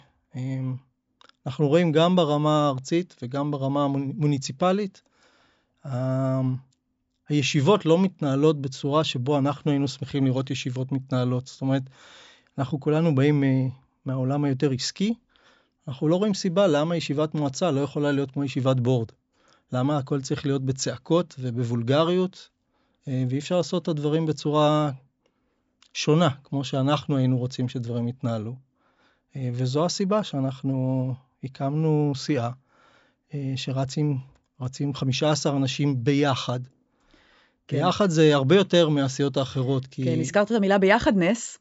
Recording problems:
high frequencies cut off; noticeable; nothing above 8 kHz

